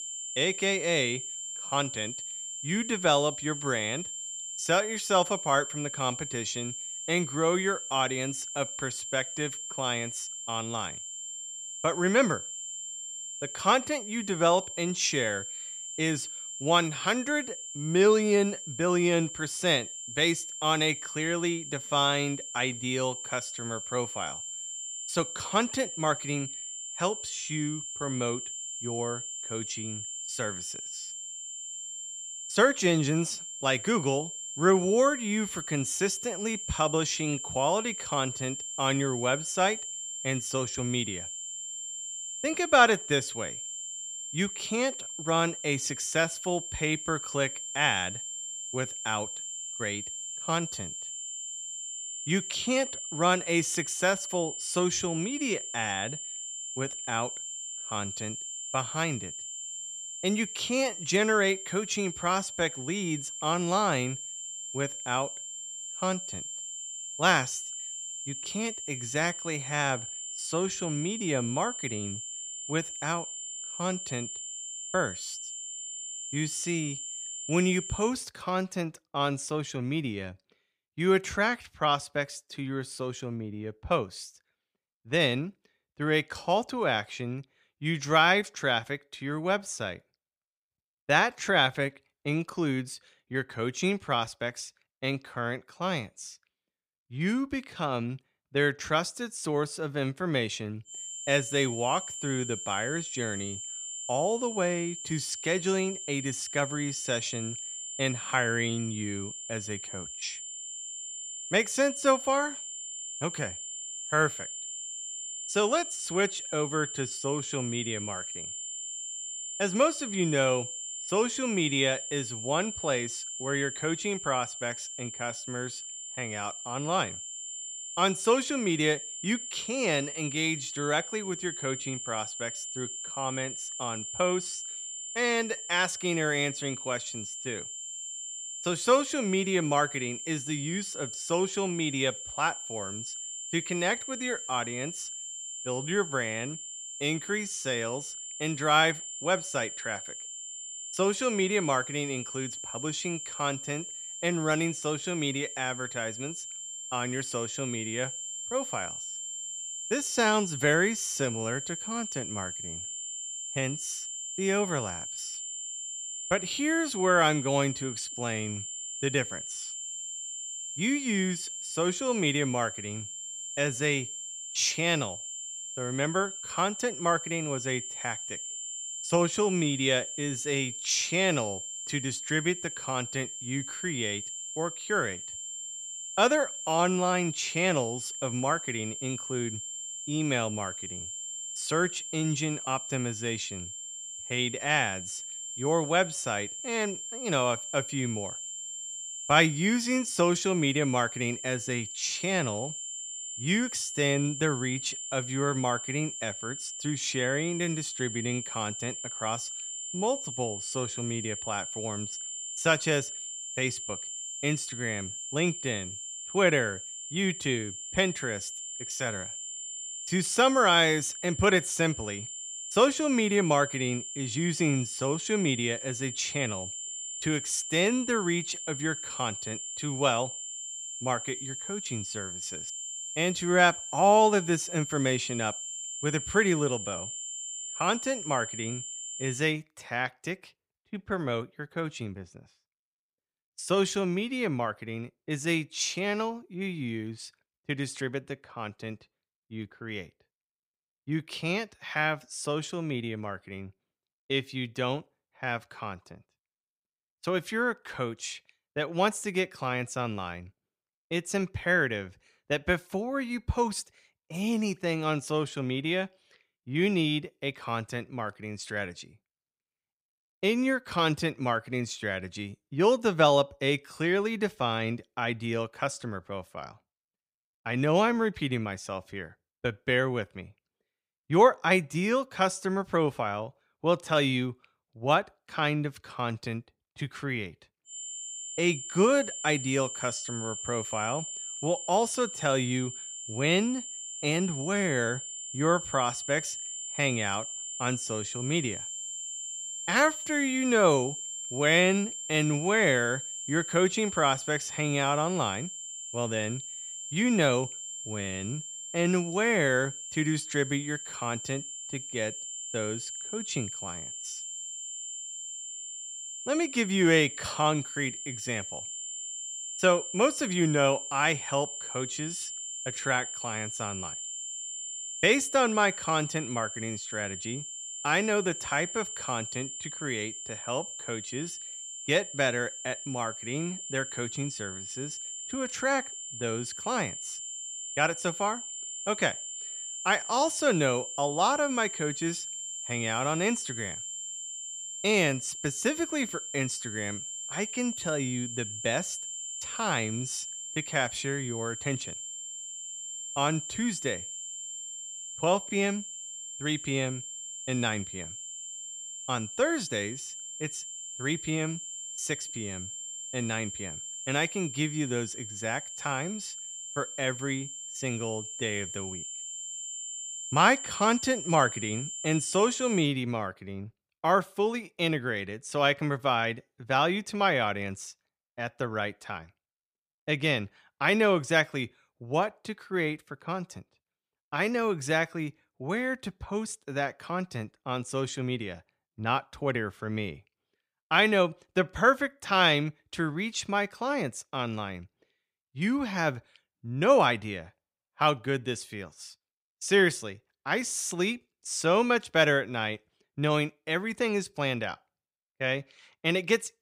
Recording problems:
high-pitched whine; loud; until 1:18, from 1:41 to 3:59 and from 4:48 to 6:13; 7.5 kHz, 7 dB below the speech

